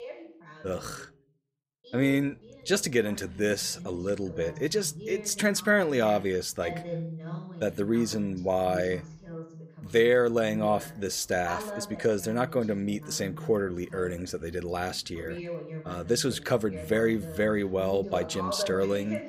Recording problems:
voice in the background; noticeable; throughout; 15 dB below the speech

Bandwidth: 15 kHz